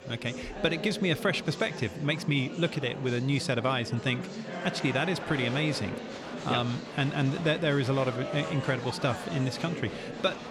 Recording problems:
murmuring crowd; loud; throughout; 9 dB below the speech

